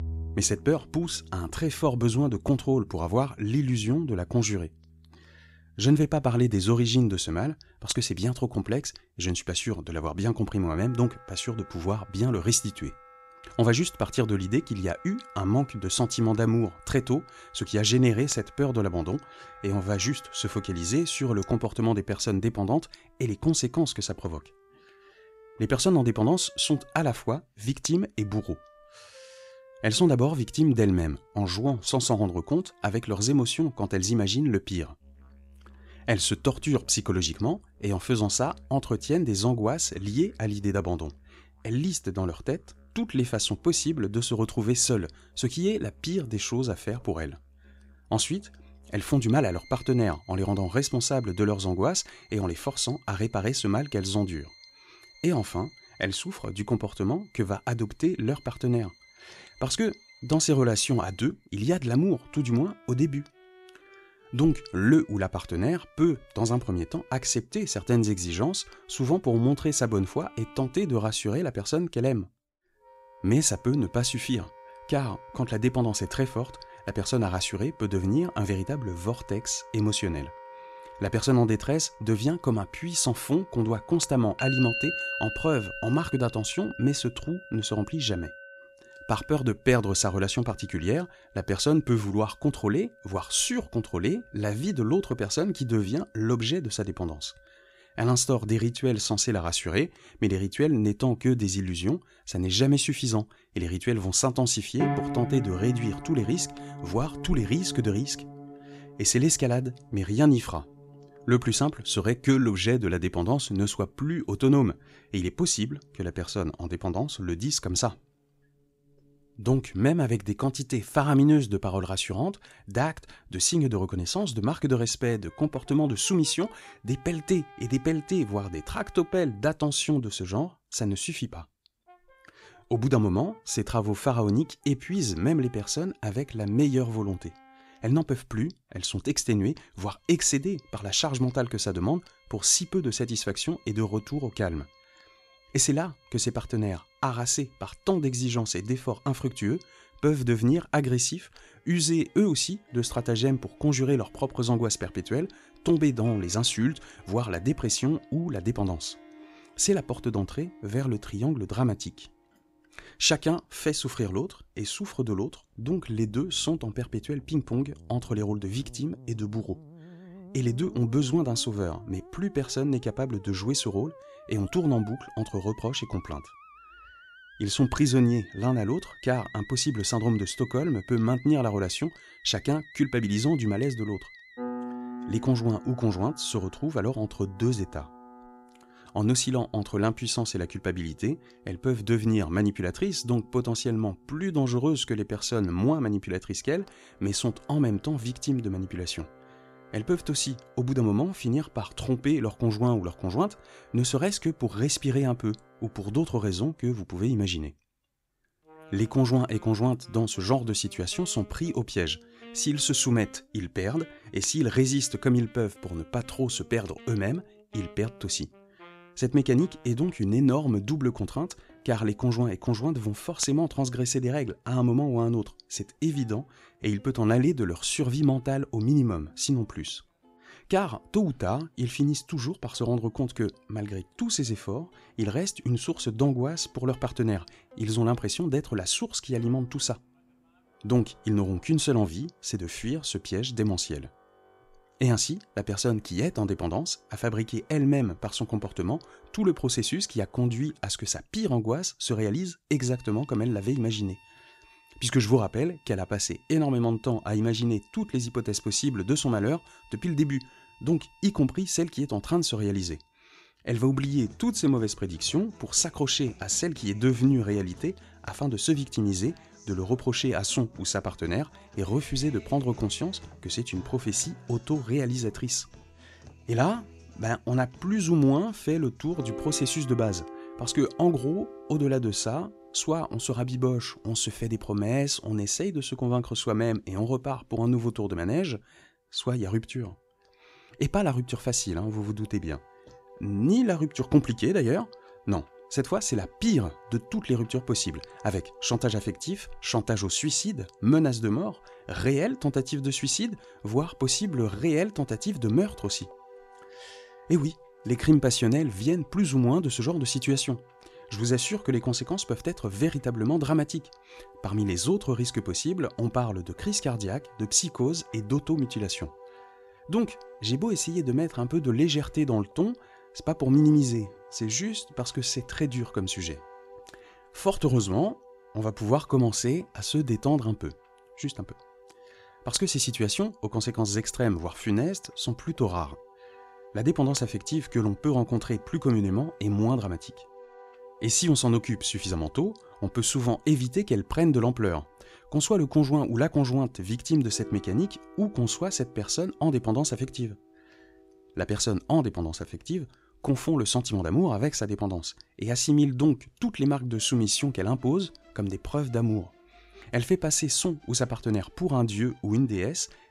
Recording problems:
background music; noticeable; throughout; 20 dB below the speech

